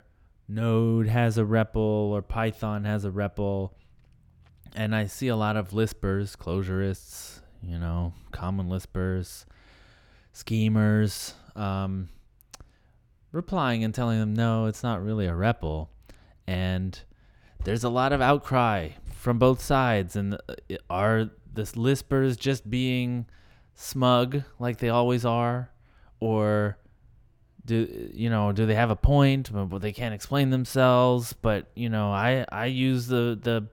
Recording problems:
none

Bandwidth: 17 kHz